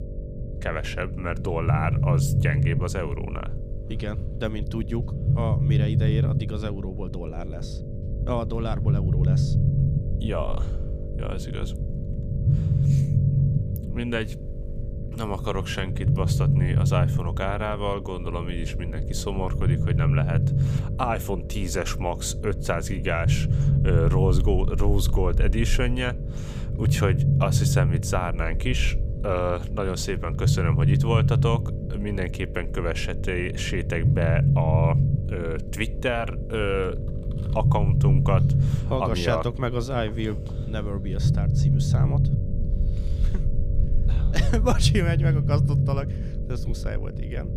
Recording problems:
low rumble; loud; throughout; 6 dB below the speech
electrical hum; noticeable; throughout; 50 Hz, 15 dB below the speech

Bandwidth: 15 kHz